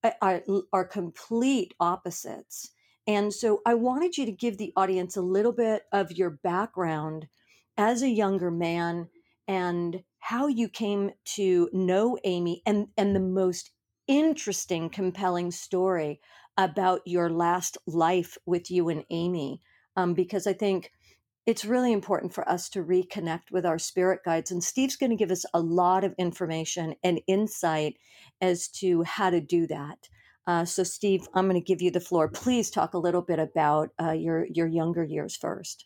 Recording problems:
none

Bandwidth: 17 kHz